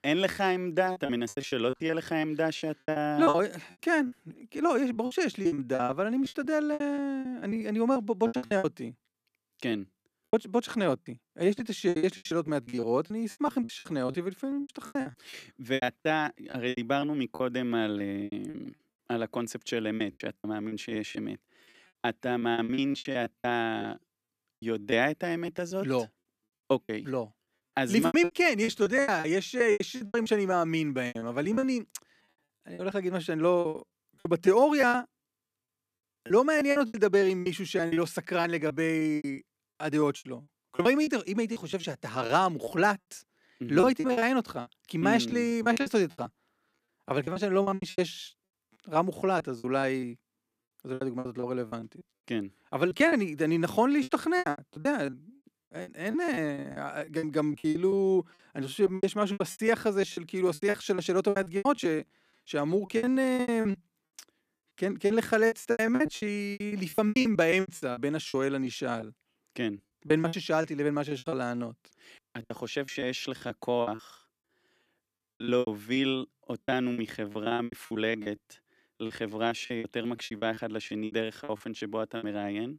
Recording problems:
choppy; very; 18% of the speech affected

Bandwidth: 14.5 kHz